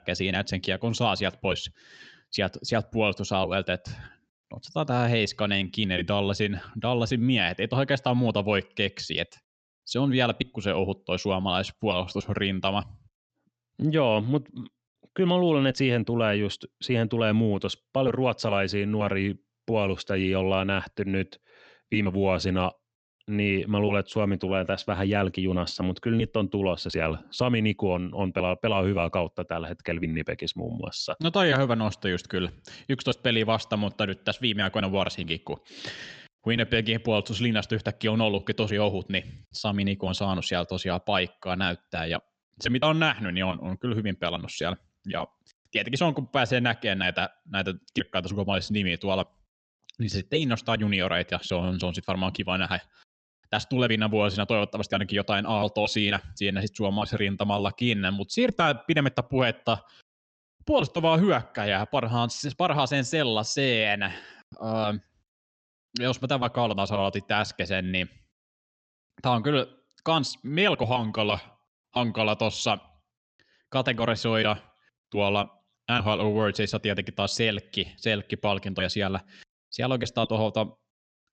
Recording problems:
high frequencies cut off; noticeable; nothing above 8 kHz

